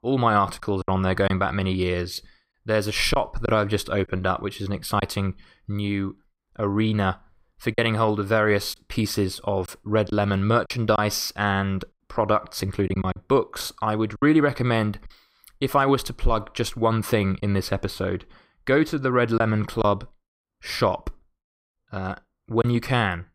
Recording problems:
choppy; occasionally; 3% of the speech affected

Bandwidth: 15.5 kHz